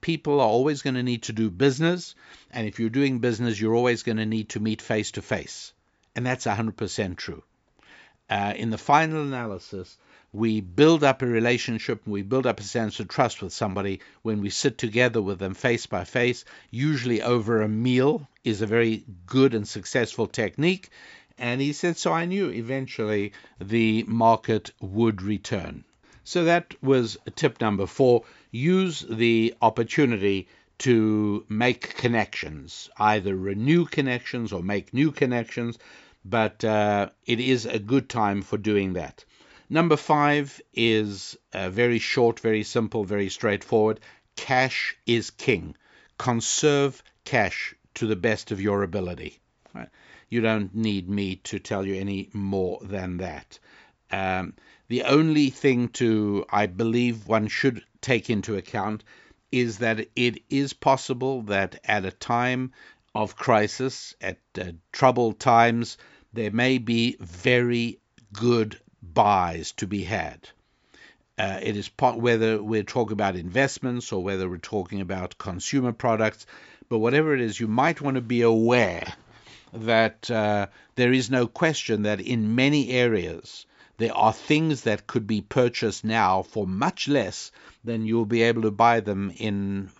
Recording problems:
high frequencies cut off; noticeable; nothing above 8 kHz

